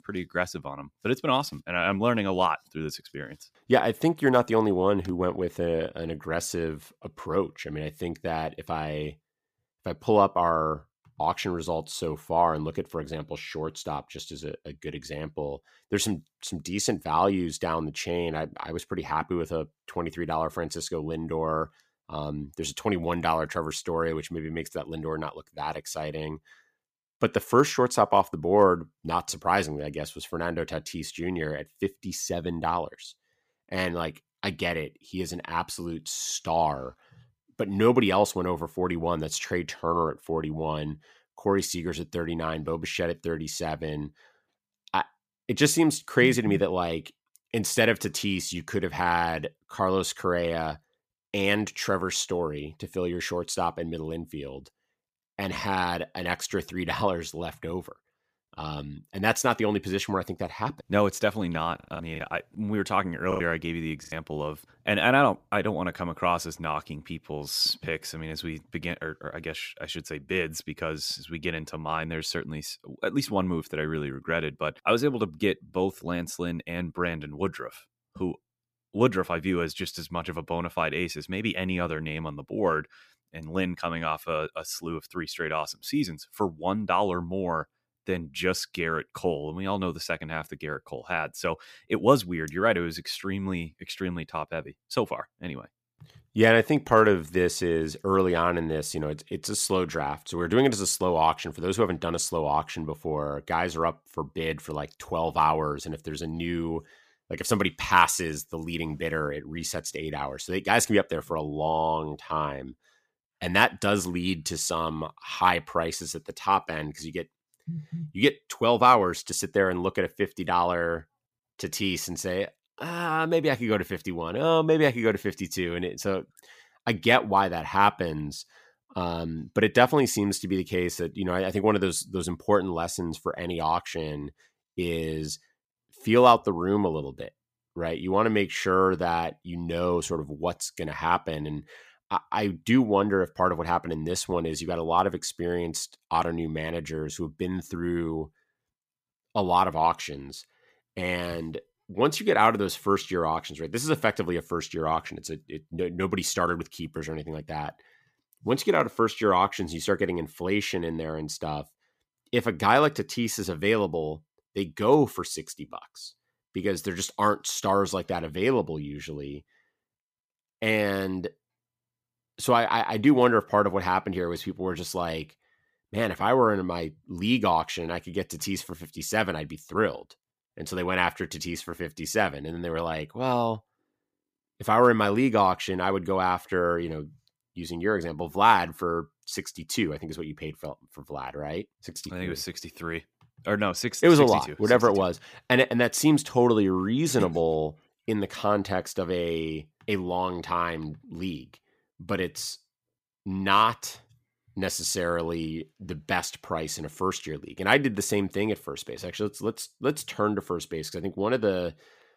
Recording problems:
choppy; very; from 1:02 to 1:04; 8% of the speech affected

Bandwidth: 15 kHz